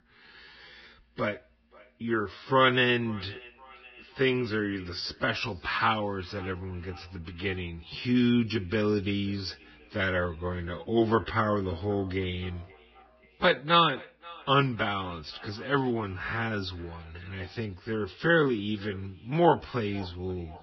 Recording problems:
garbled, watery; badly; nothing above 5.5 kHz
wrong speed, natural pitch; too slow; 0.6 times normal speed
echo of what is said; faint; throughout; 530 ms later, 25 dB below the speech

